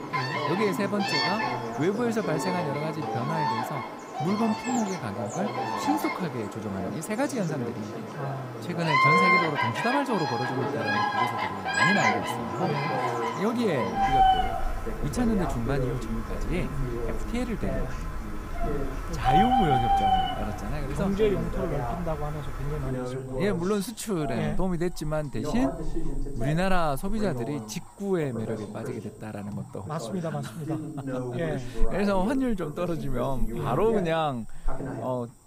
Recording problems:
animal sounds; very loud; throughout; 2 dB above the speech
voice in the background; loud; throughout; 6 dB below the speech

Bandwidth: 15.5 kHz